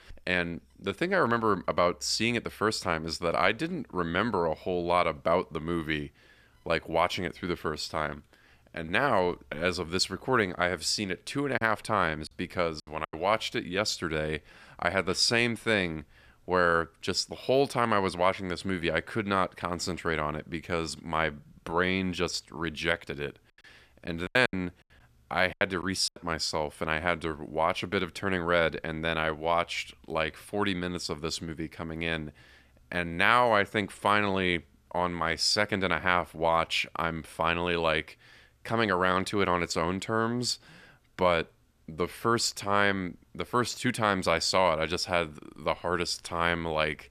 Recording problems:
choppy; very; from 12 to 13 s and from 24 to 26 s; 11% of the speech affected

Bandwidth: 14.5 kHz